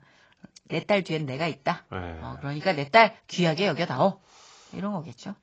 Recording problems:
garbled, watery; badly; nothing above 7.5 kHz

